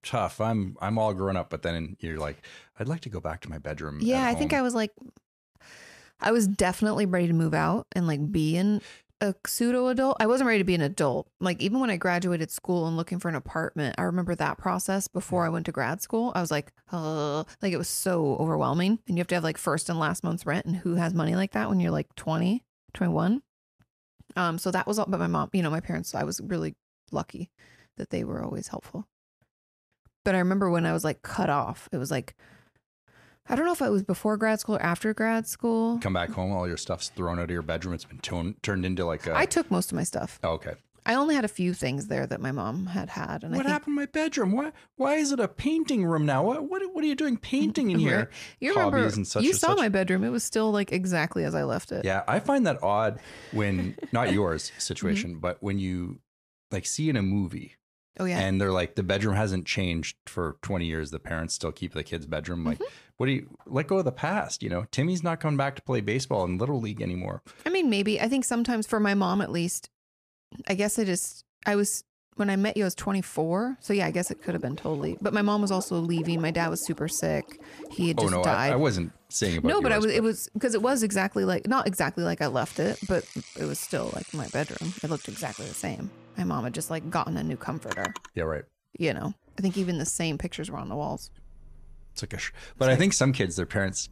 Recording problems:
household noises; noticeable; from 1:14 on; 15 dB below the speech

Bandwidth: 14.5 kHz